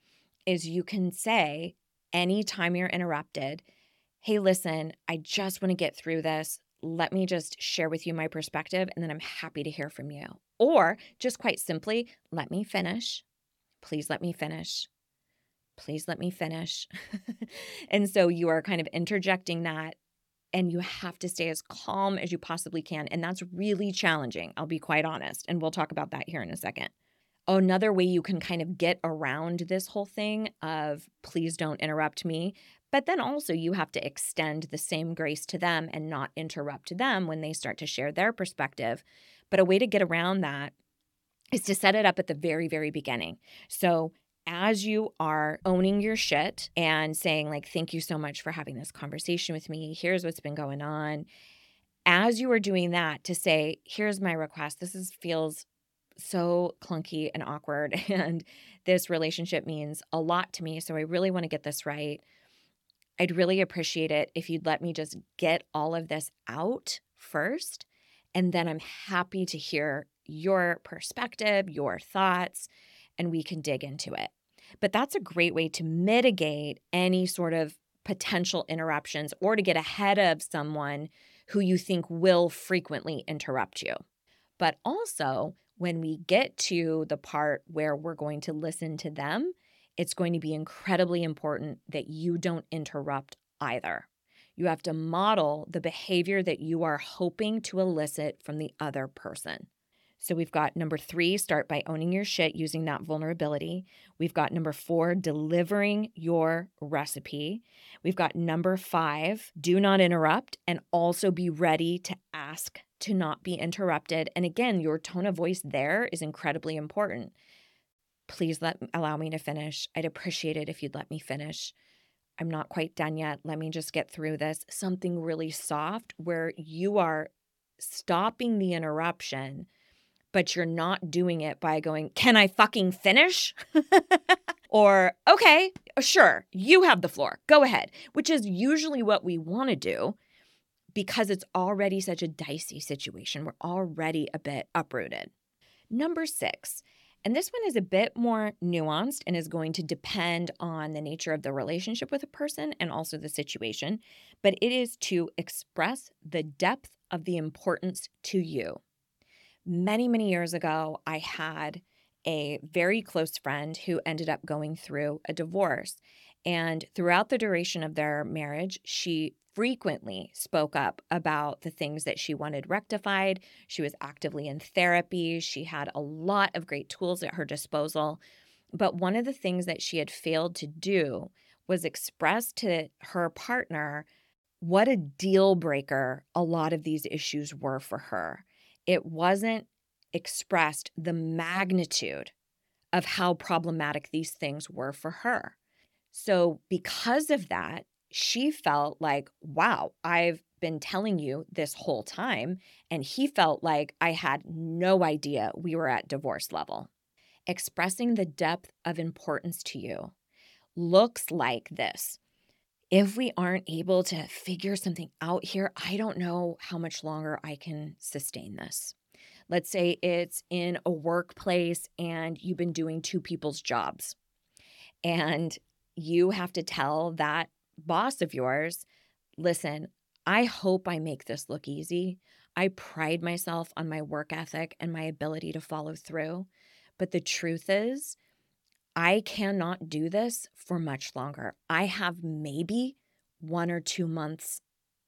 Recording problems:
none

